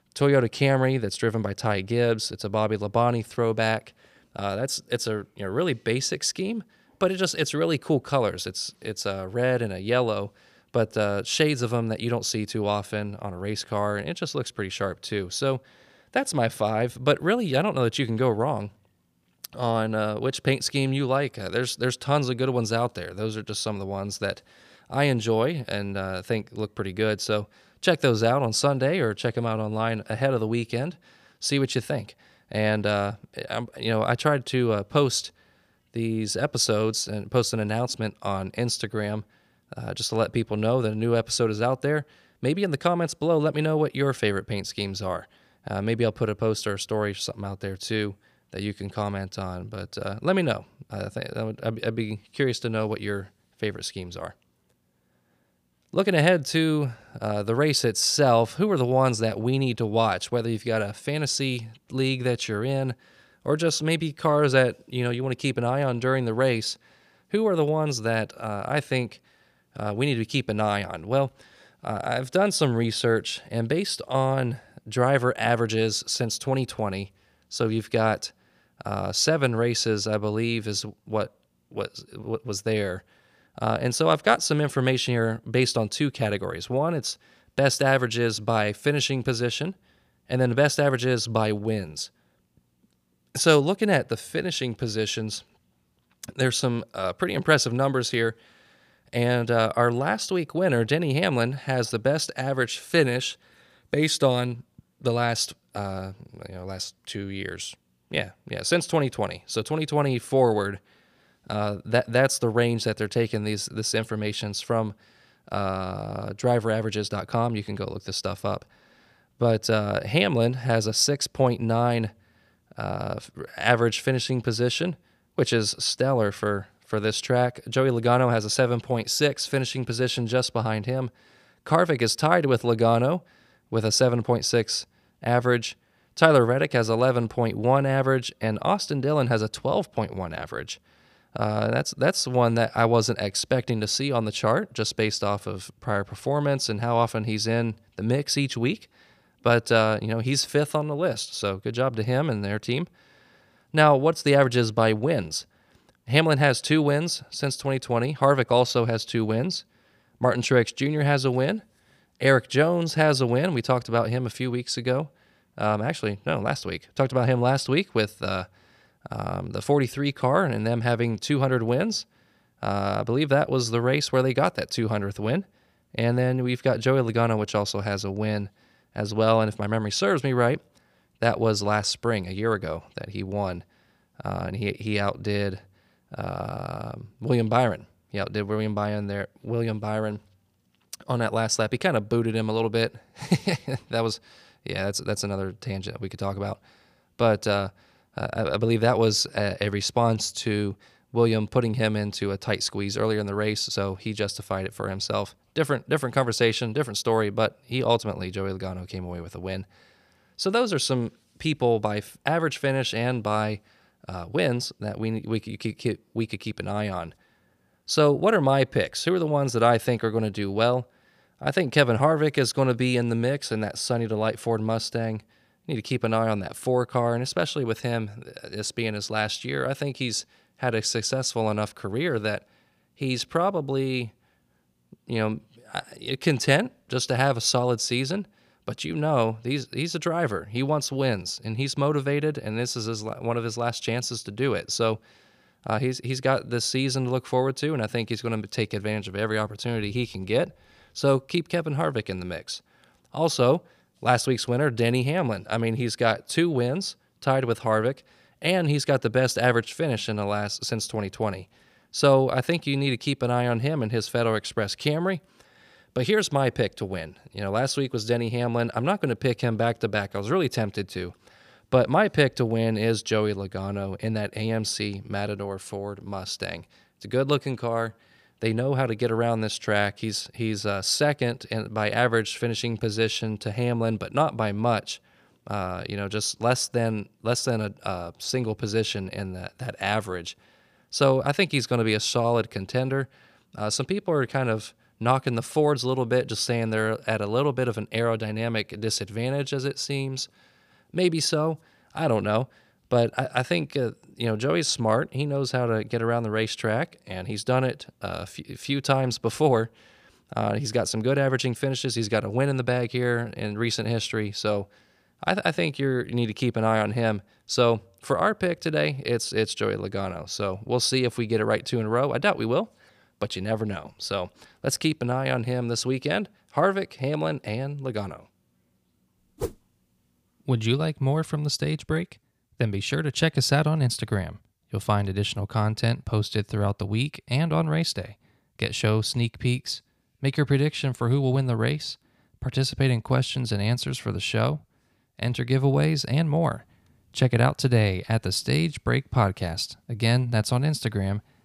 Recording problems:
none

